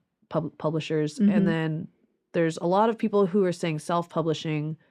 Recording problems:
muffled; slightly; fading above 3 kHz

